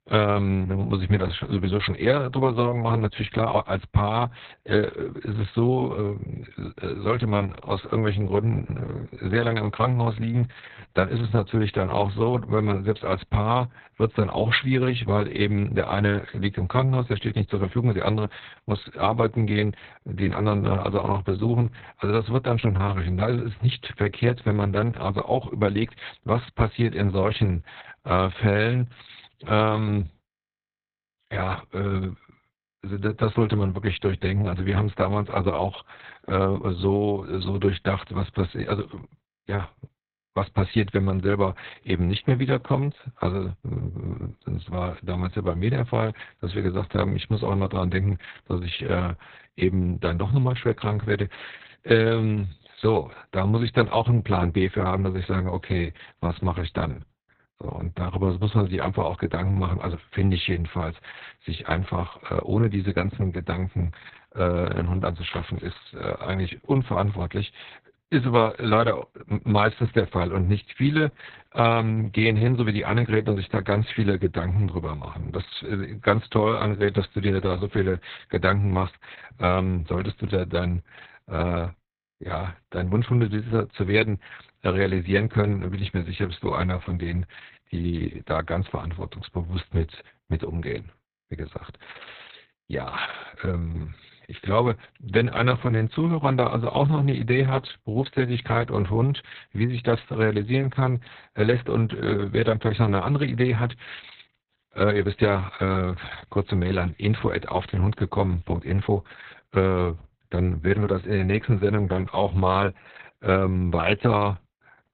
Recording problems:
garbled, watery; badly; nothing above 4 kHz

